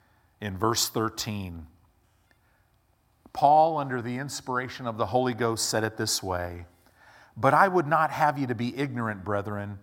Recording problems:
none

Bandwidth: 16.5 kHz